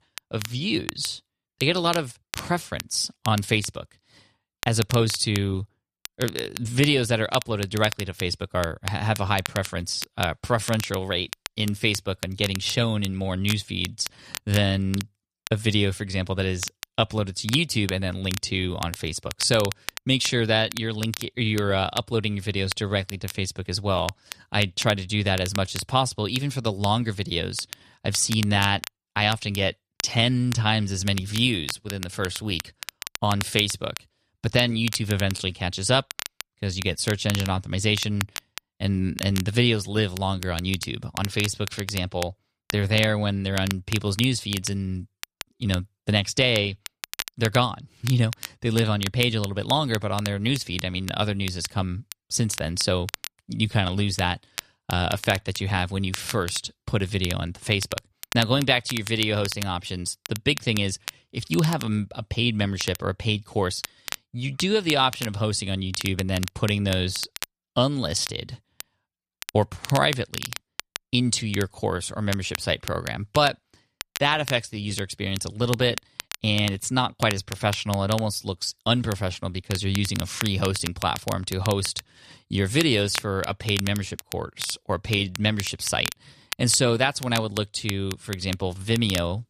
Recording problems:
crackle, like an old record; noticeable; 10 dB below the speech

